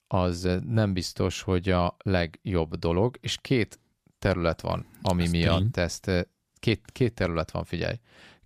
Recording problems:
none

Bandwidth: 15 kHz